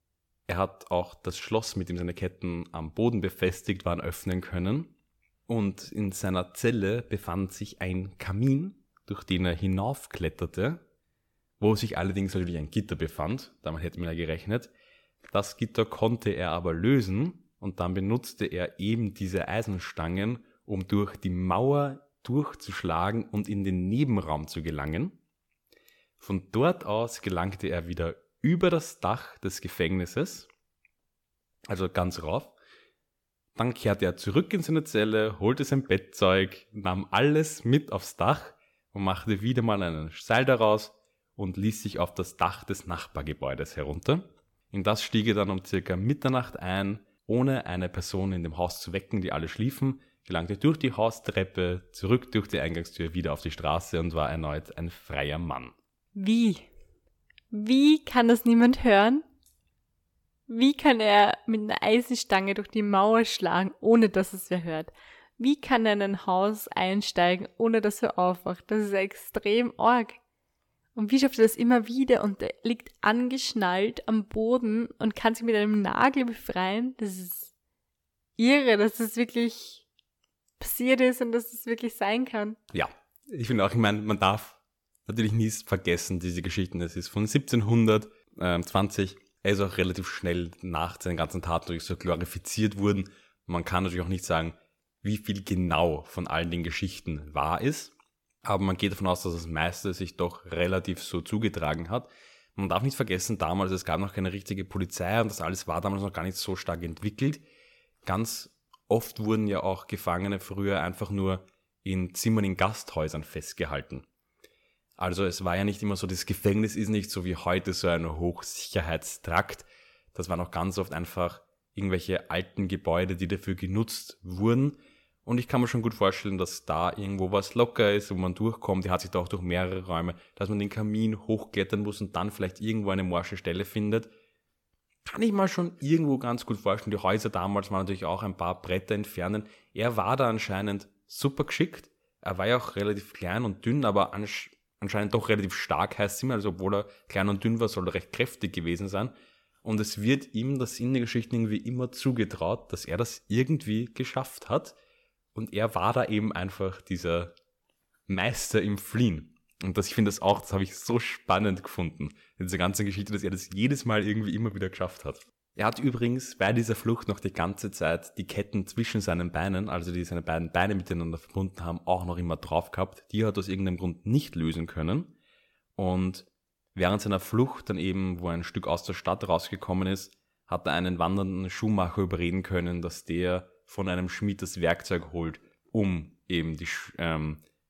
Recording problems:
none

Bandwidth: 17.5 kHz